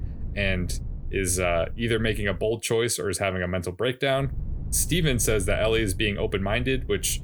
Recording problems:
low rumble; faint; until 2.5 s and from 4 s on; 25 dB below the speech

